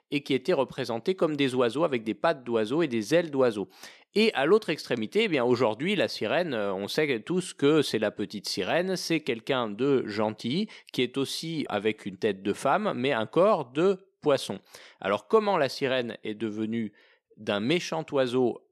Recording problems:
none

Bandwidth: 13.5 kHz